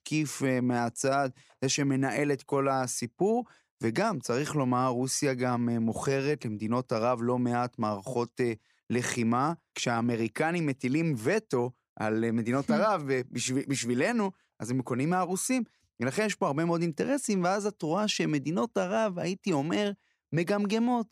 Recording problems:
none

